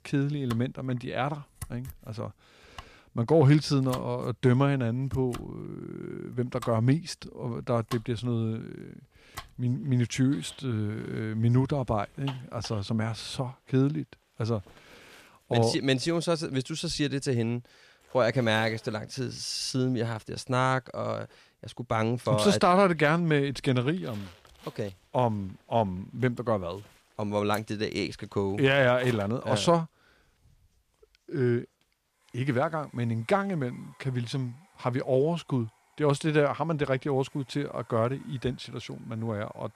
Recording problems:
household noises; faint; throughout; 20 dB below the speech

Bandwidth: 14.5 kHz